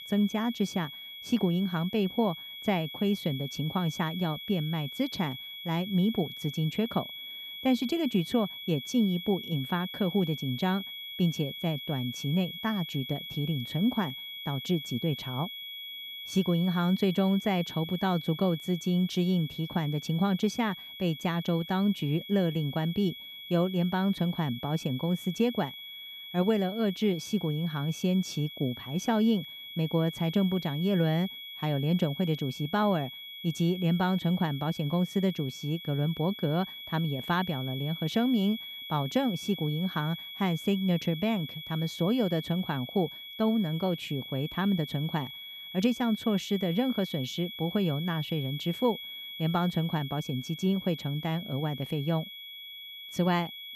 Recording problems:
high-pitched whine; loud; throughout; 3.5 kHz, 10 dB below the speech

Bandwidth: 14.5 kHz